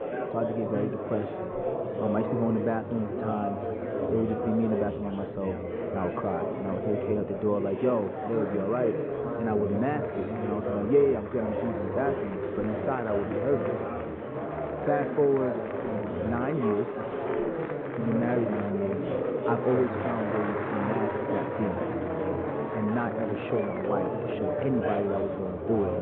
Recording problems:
muffled; very; fading above 3.5 kHz
high frequencies cut off; severe; nothing above 4 kHz
murmuring crowd; loud; throughout; 1 dB below the speech

